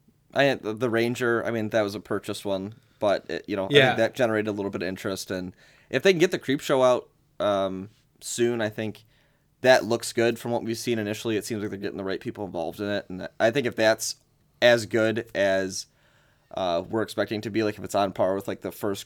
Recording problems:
none

